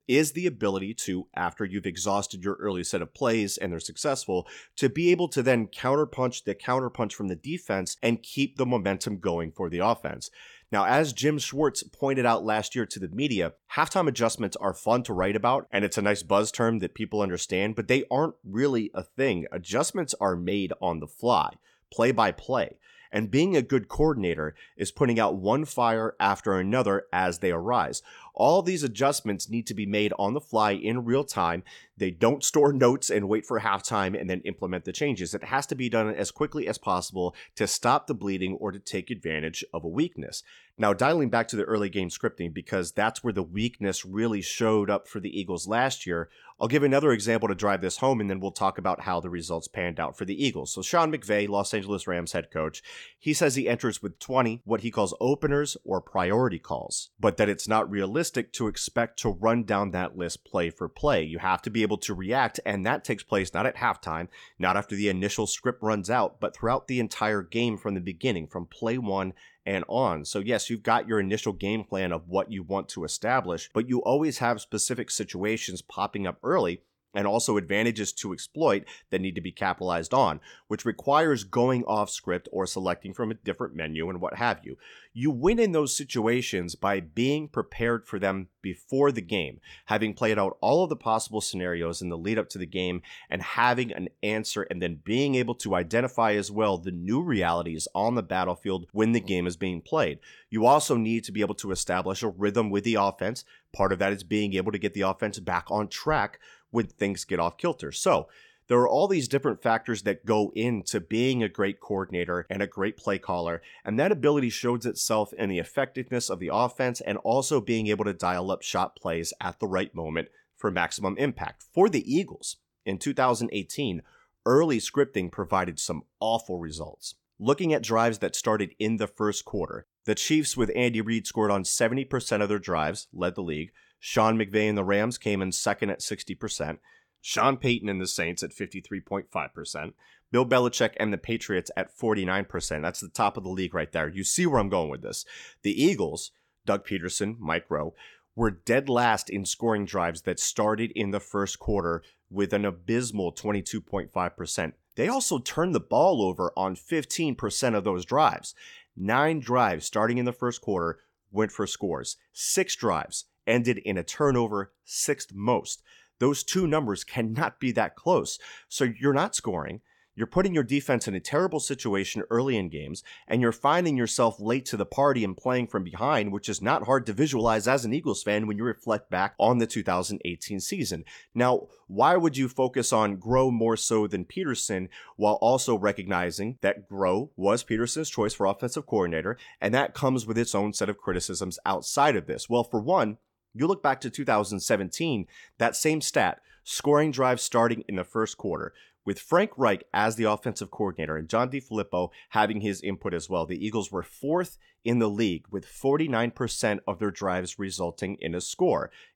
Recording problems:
none

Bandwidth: 17.5 kHz